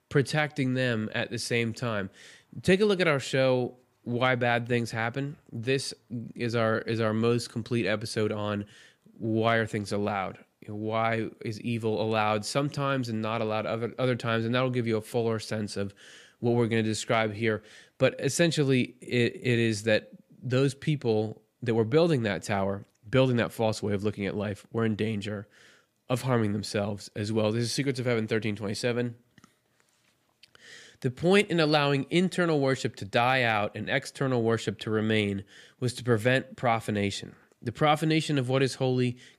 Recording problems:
none

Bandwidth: 15 kHz